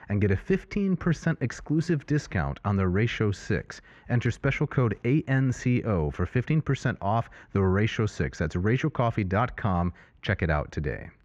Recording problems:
muffled; very; fading above 2 kHz

